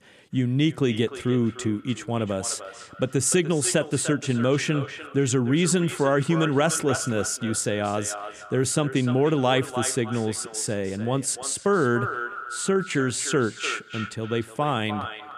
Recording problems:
echo of what is said; strong; throughout; 300 ms later, 10 dB below the speech

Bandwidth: 14.5 kHz